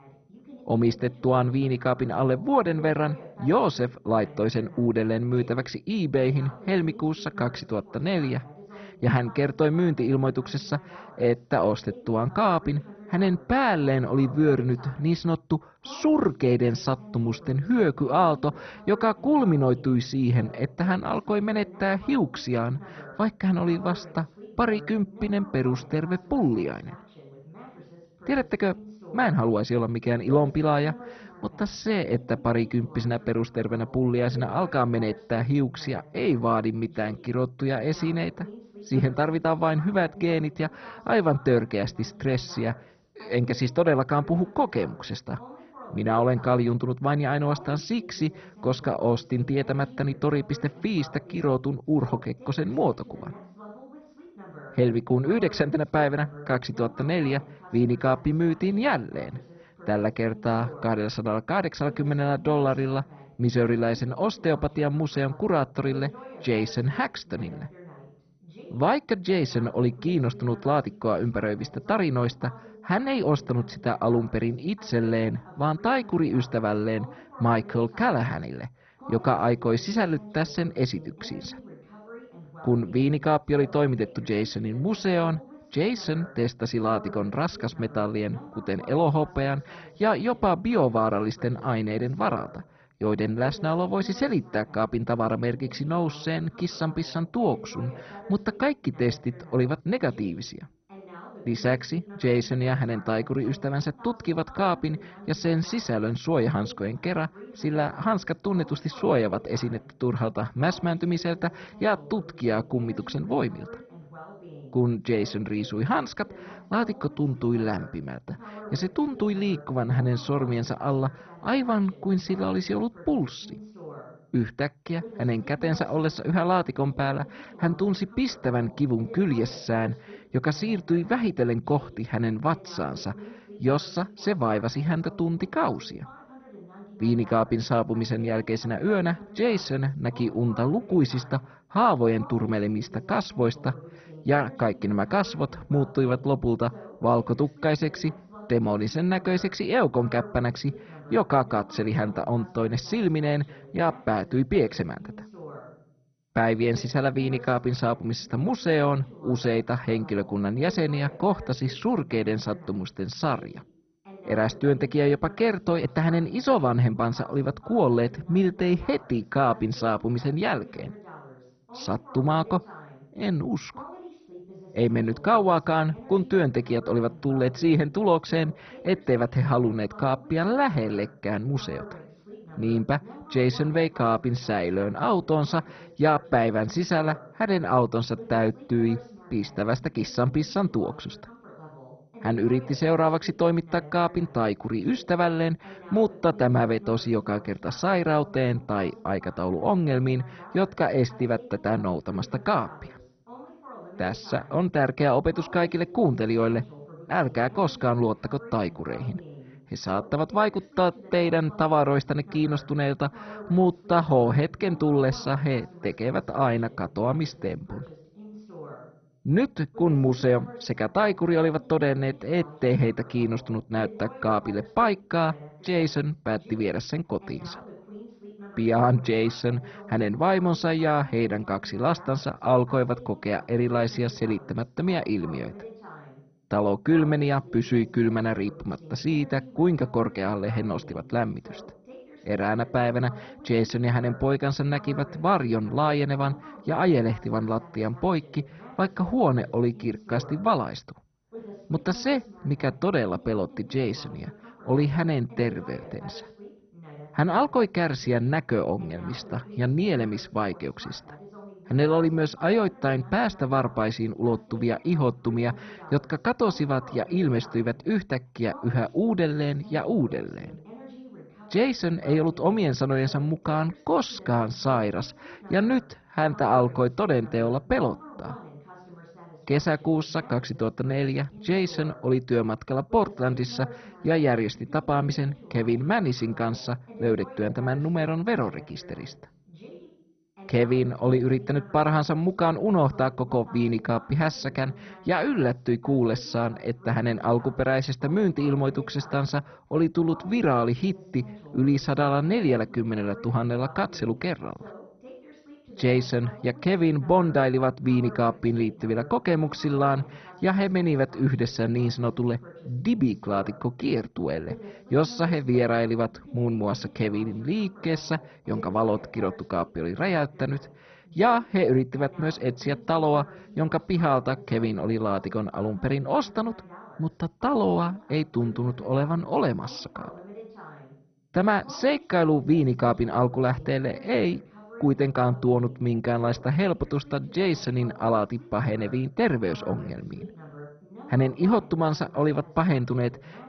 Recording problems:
garbled, watery; badly; nothing above 6 kHz
muffled; very slightly; fading above 2.5 kHz
voice in the background; noticeable; throughout; 20 dB below the speech

